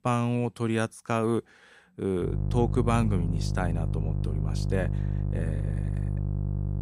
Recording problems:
electrical hum; noticeable; from 2.5 s on; 50 Hz, 10 dB below the speech

